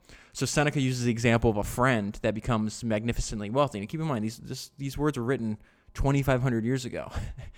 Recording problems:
none

